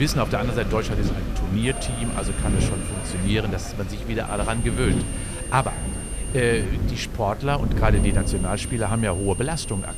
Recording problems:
high-pitched whine; loud; from 1.5 to 3.5 s, from 4.5 to 6.5 s and from 8 s on; 9 kHz, 9 dB below the speech
background chatter; noticeable; throughout; 4 voices, 15 dB below the speech
wind noise on the microphone; occasional gusts; 10 dB below the speech
hiss; noticeable; throughout; 15 dB below the speech
abrupt cut into speech; at the start

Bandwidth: 14.5 kHz